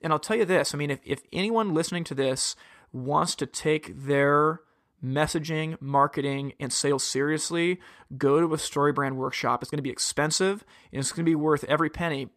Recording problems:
uneven, jittery; strongly; from 1.5 to 11 s

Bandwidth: 14.5 kHz